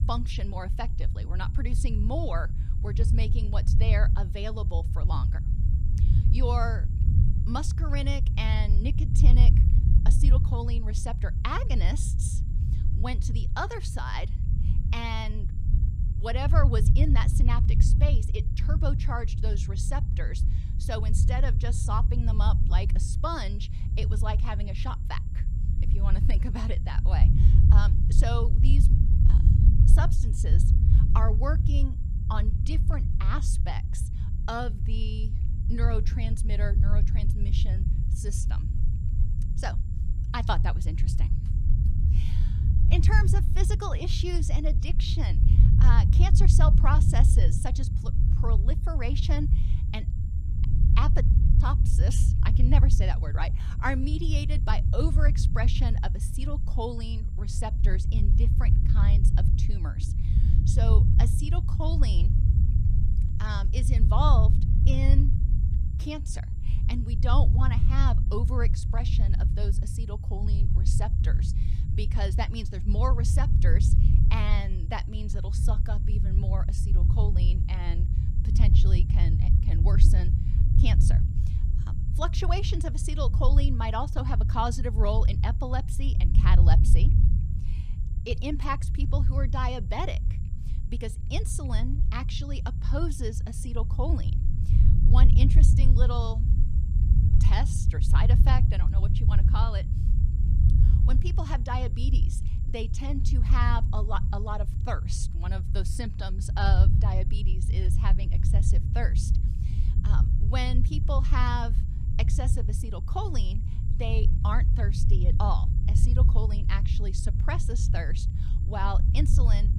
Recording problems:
low rumble; loud; throughout; 6 dB below the speech
high-pitched whine; faint; throughout; 7 kHz, 35 dB below the speech

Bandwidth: 15.5 kHz